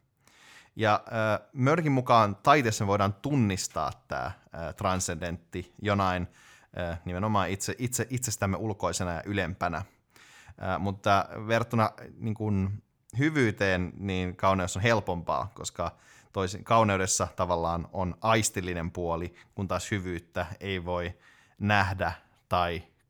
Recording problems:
none

